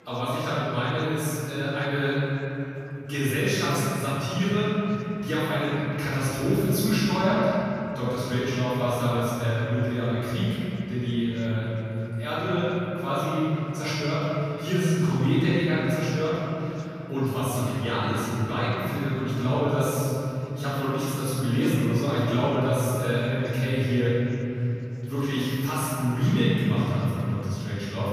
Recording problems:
room echo; strong; dies away in 3 s
off-mic speech; far
chatter from many people; faint; throughout; 25 dB below the speech

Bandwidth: 14.5 kHz